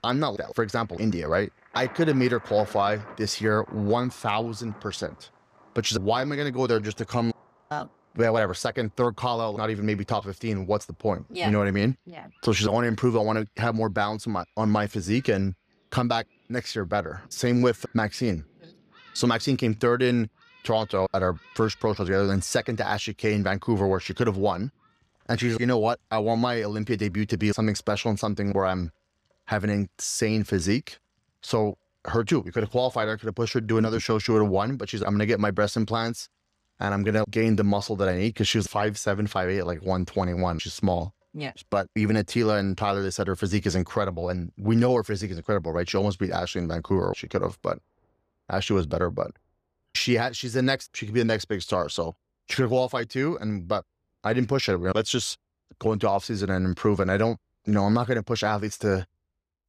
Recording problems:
rain or running water; faint; throughout; 25 dB below the speech

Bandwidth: 14.5 kHz